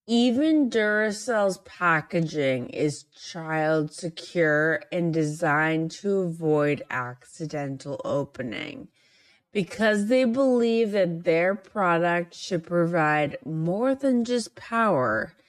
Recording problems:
wrong speed, natural pitch; too slow; 0.6 times normal speed

